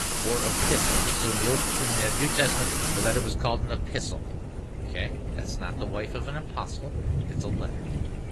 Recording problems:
garbled, watery; slightly
rain or running water; very loud; throughout; 4 dB above the speech
wind noise on the microphone; occasional gusts; 20 dB below the speech

